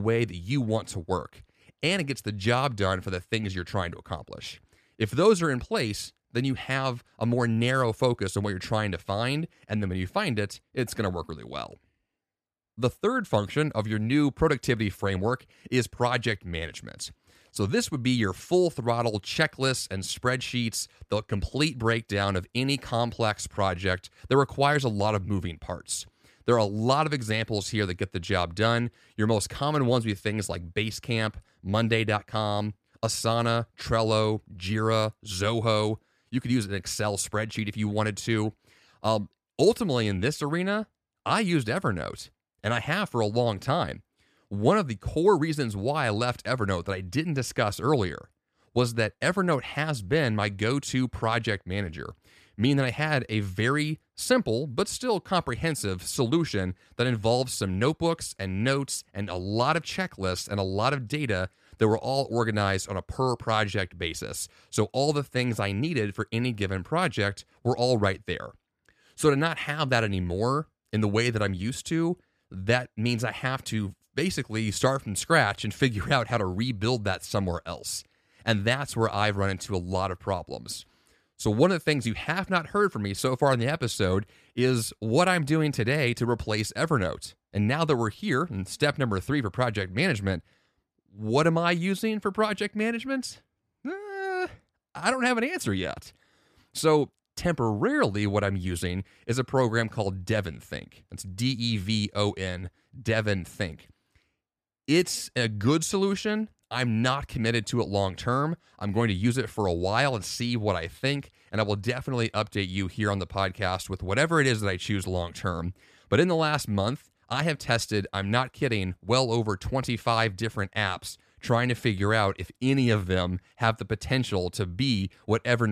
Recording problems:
abrupt cut into speech; at the start and the end

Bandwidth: 14.5 kHz